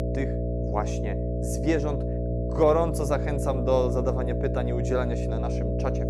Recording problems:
electrical hum; loud; throughout; 60 Hz, 5 dB below the speech

